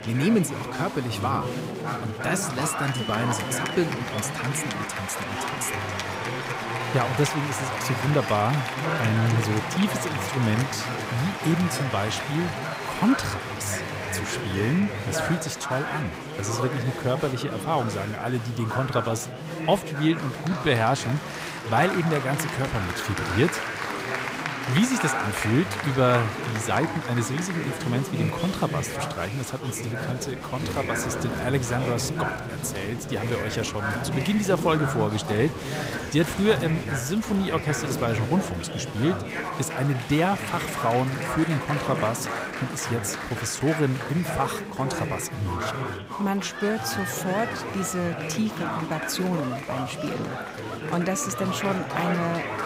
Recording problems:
chatter from many people; loud; throughout; 3 dB below the speech

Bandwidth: 15.5 kHz